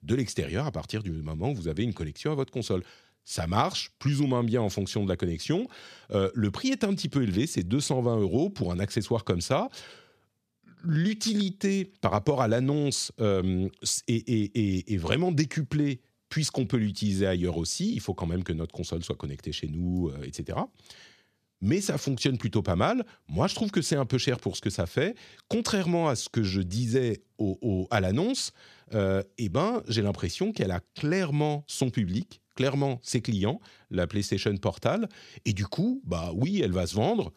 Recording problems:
none

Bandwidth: 14.5 kHz